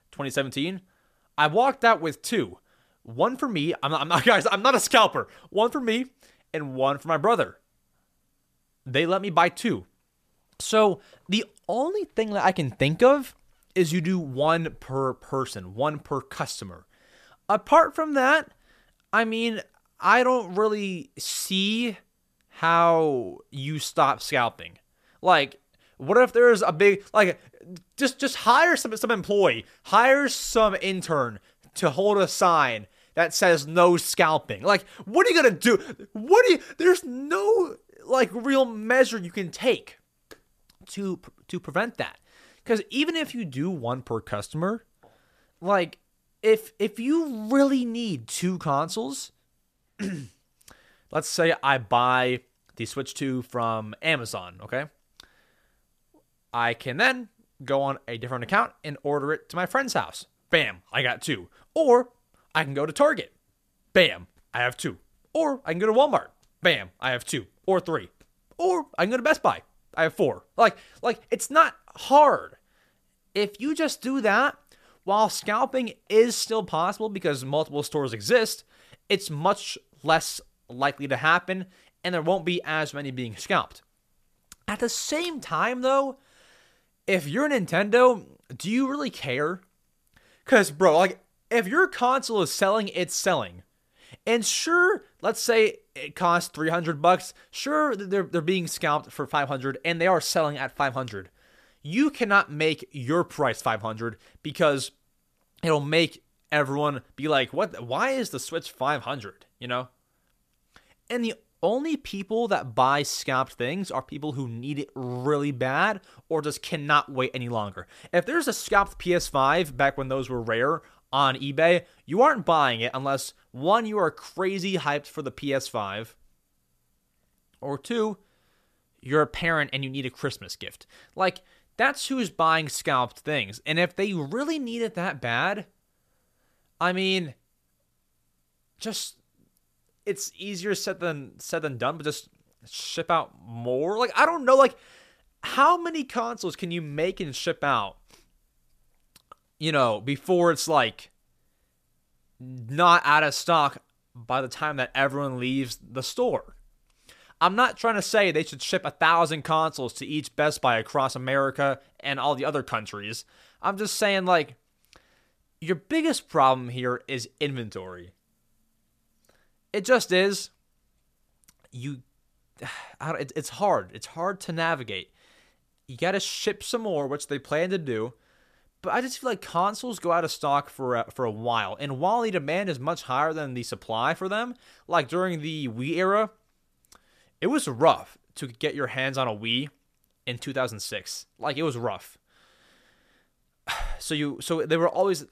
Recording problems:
none

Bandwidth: 14.5 kHz